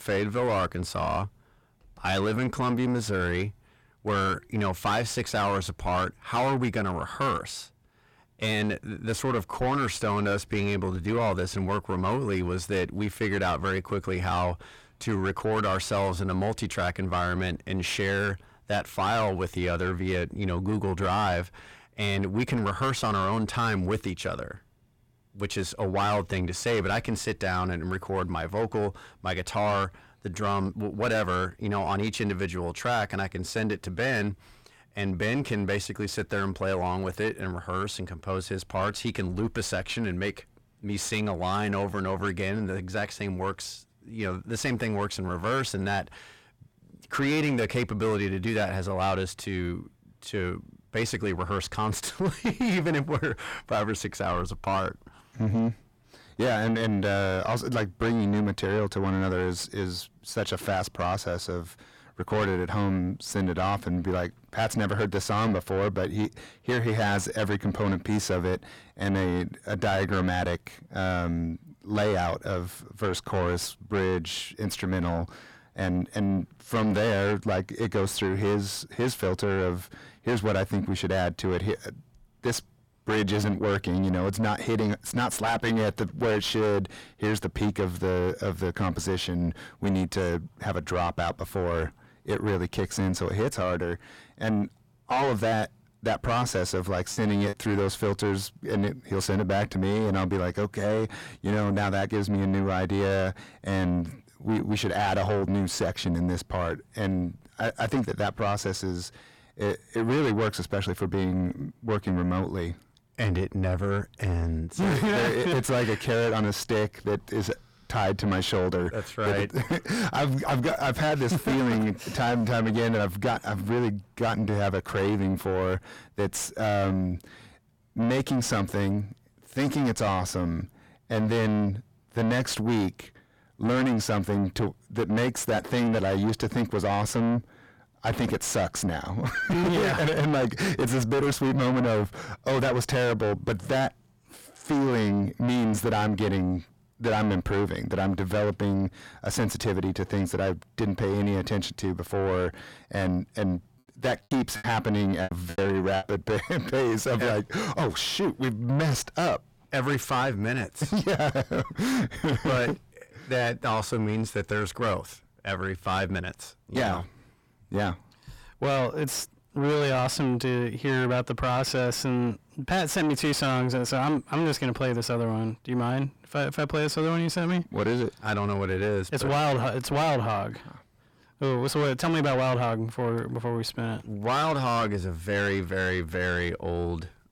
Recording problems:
distortion; heavy; 5 dB below the speech
choppy; very; at 1:37 and from 2:34 to 2:36; 9% of the speech affected

